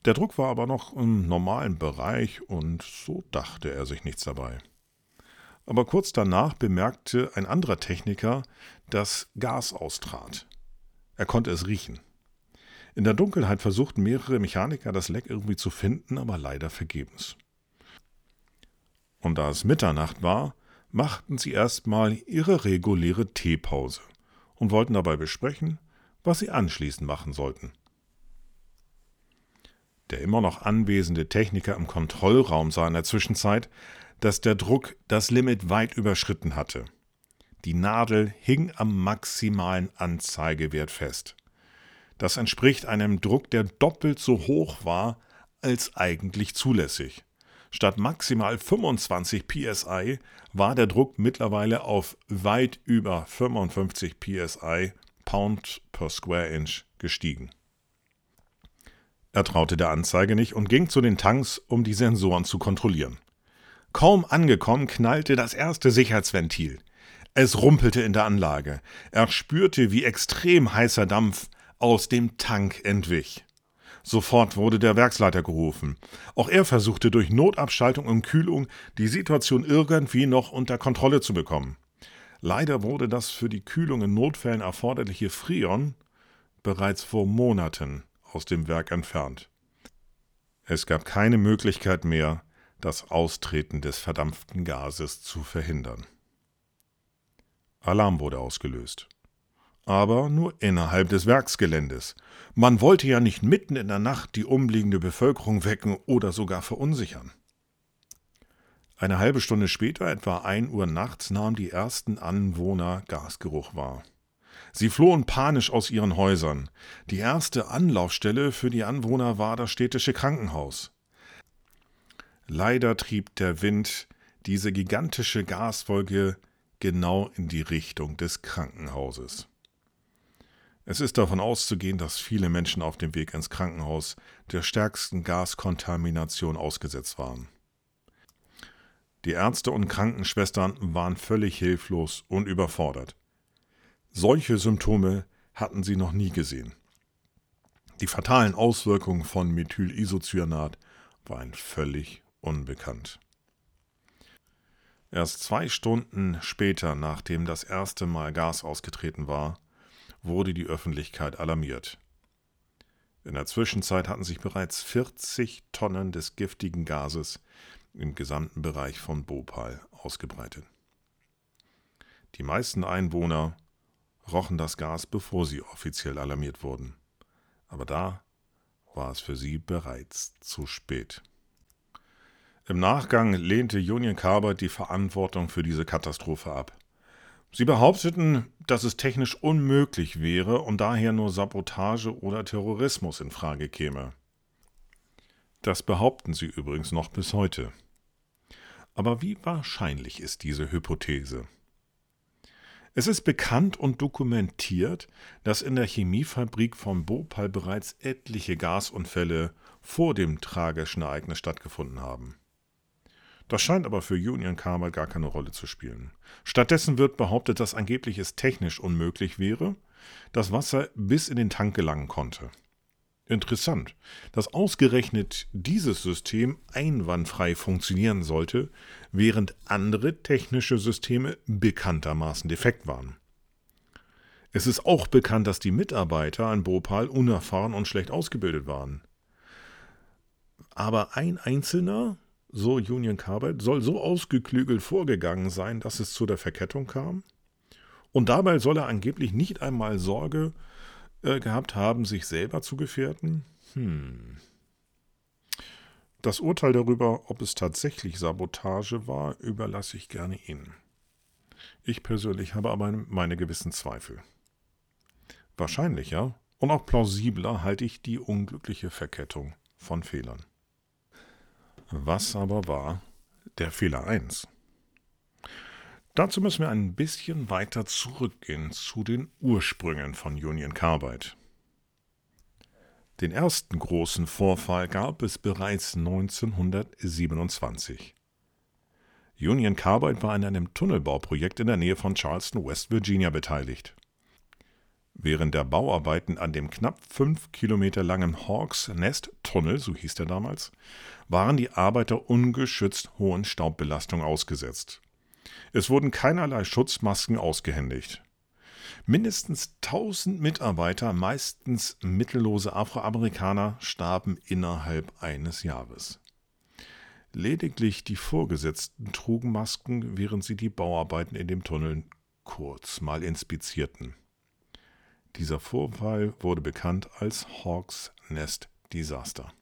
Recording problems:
none

